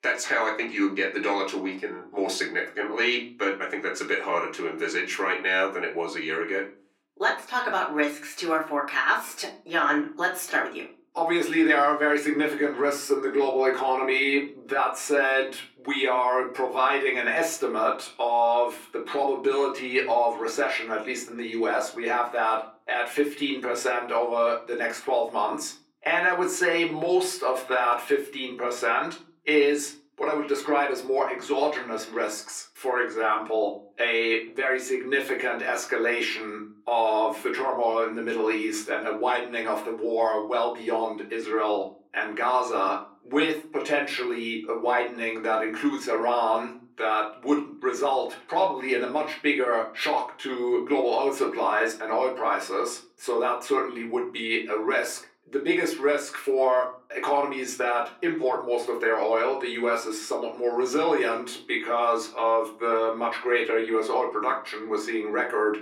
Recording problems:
off-mic speech; far
thin; somewhat; fading below 300 Hz
room echo; very slight; dies away in 0.3 s

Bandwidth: 17 kHz